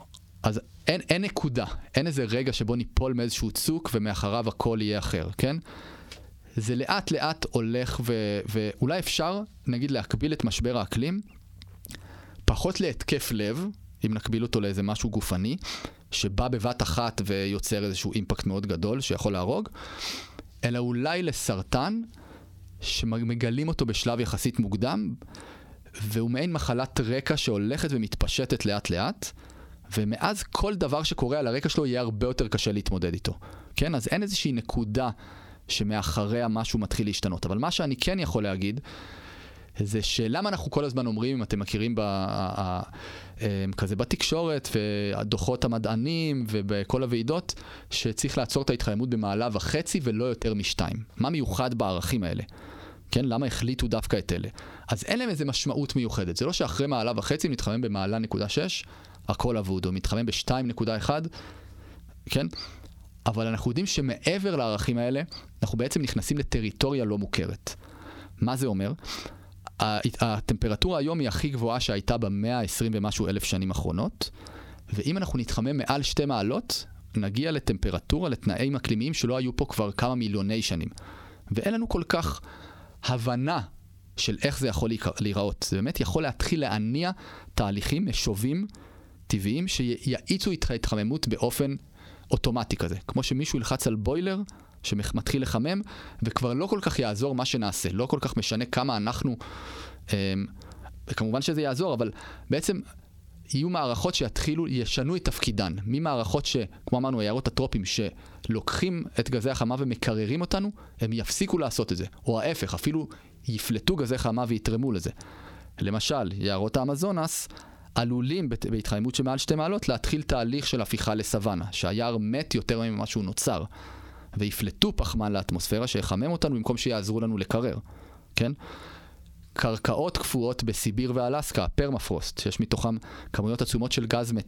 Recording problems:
squashed, flat; heavily

